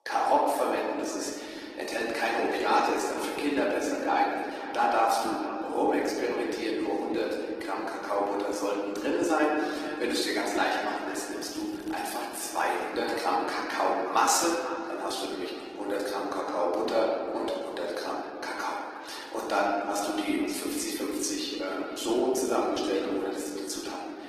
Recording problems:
off-mic speech; far
echo of what is said; noticeable; throughout; 460 ms later, 10 dB below the speech
room echo; noticeable; dies away in 2.1 s
thin; somewhat; fading below 300 Hz
garbled, watery; slightly; nothing above 14.5 kHz
crackling; faint; at 11 s; 25 dB below the speech

